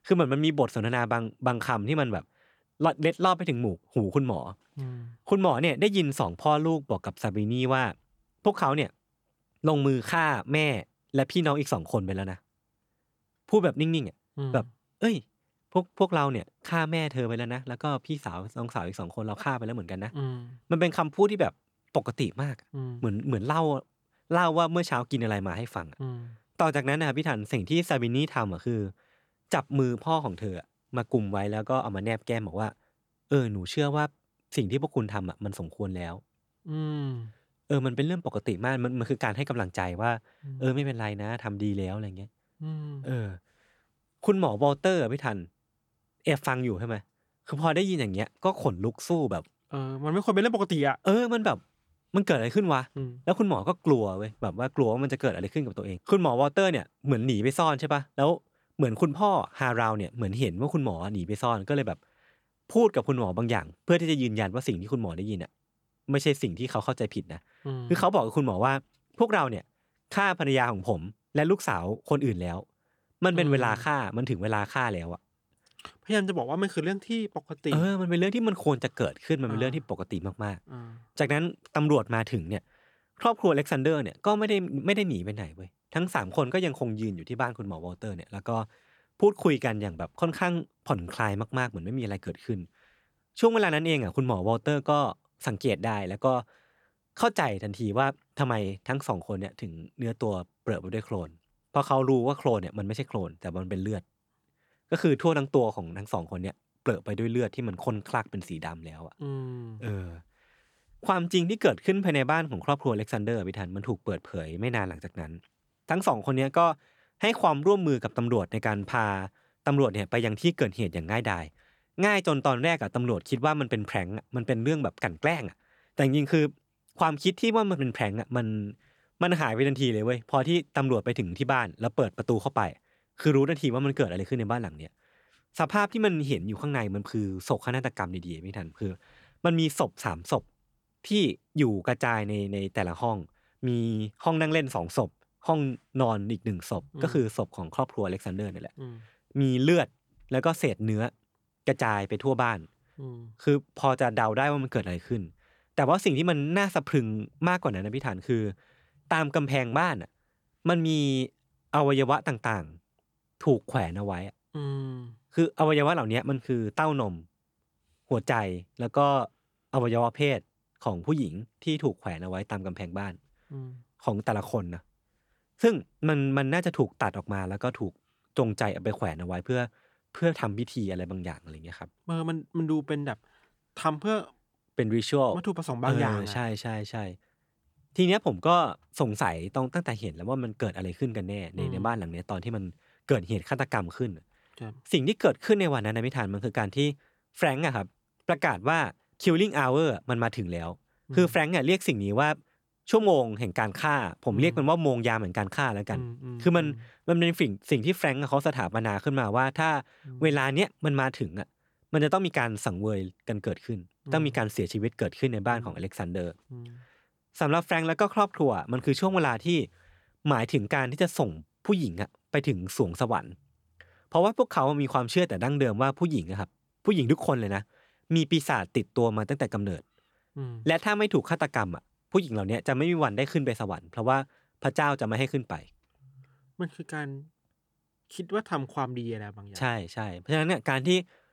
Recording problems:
none

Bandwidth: 18.5 kHz